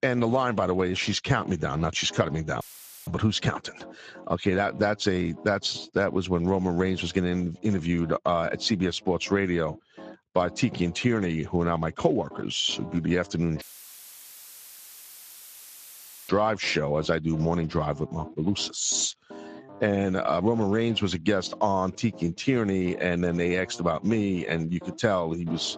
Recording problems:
garbled, watery; slightly; nothing above 7.5 kHz
background music; faint; throughout; 20 dB below the speech
audio cutting out; filled with static; at 2.5 s and at 14 s for 2.5 s

